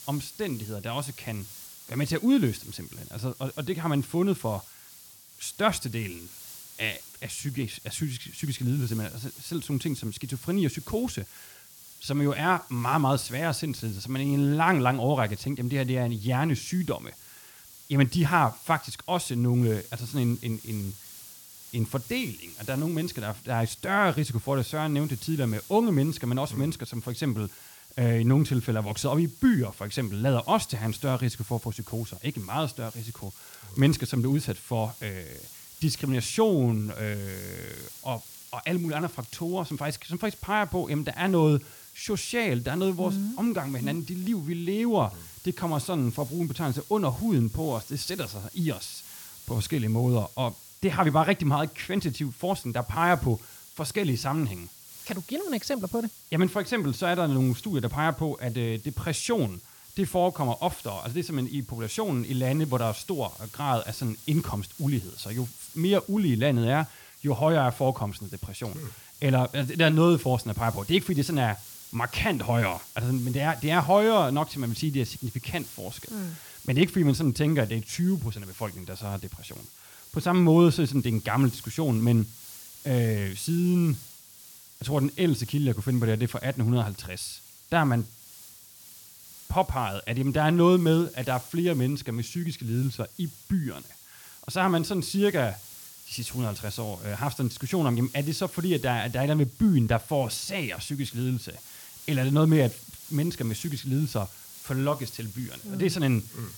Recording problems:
hiss; noticeable; throughout; 15 dB below the speech
crackling; faint; from 33 to 34 s and from 38 to 40 s; 25 dB below the speech

